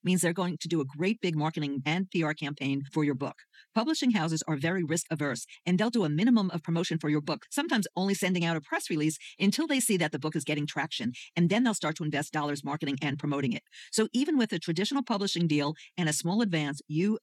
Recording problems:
wrong speed, natural pitch; too fast; 1.5 times normal speed

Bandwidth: 18 kHz